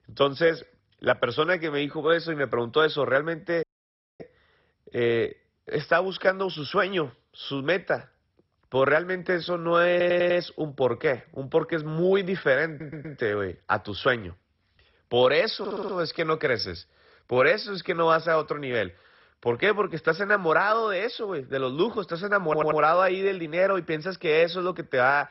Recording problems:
garbled, watery; badly; nothing above 5.5 kHz
audio cutting out; at 3.5 s for 0.5 s
audio stuttering; 4 times, first at 10 s

